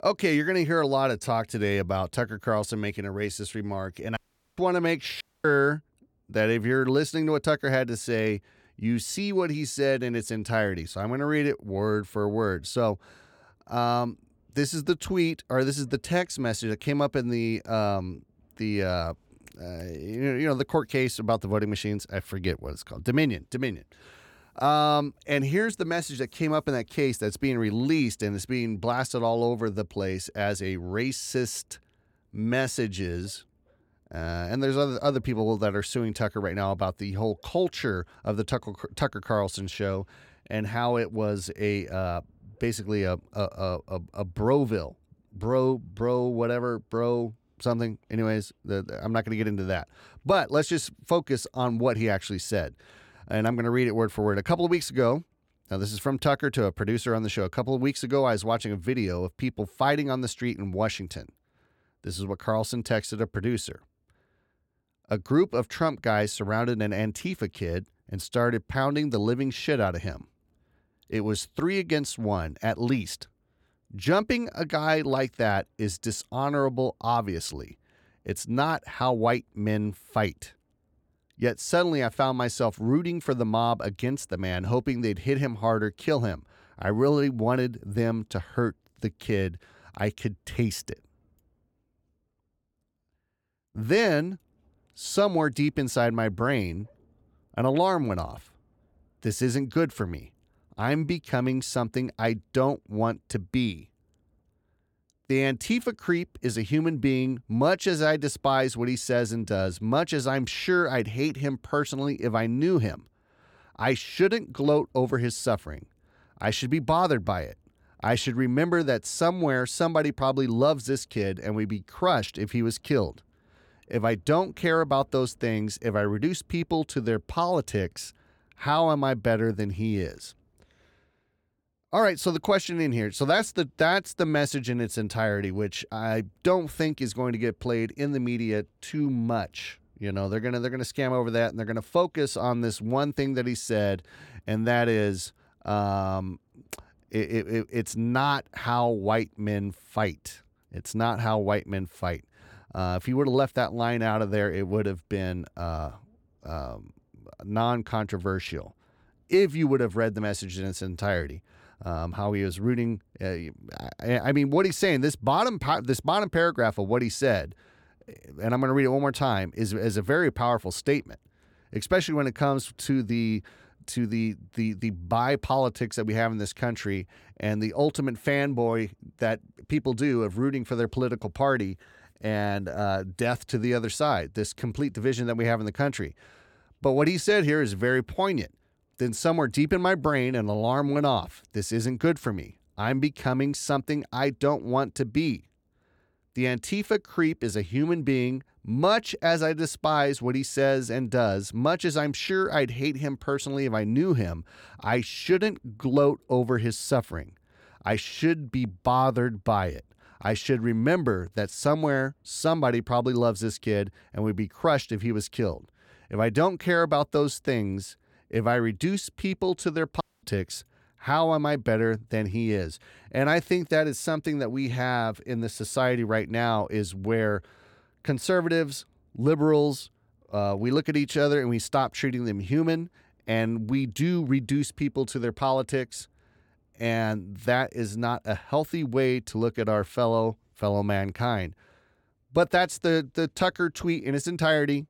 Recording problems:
audio cutting out; at 4 s, at 5 s and at 3:40

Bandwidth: 18 kHz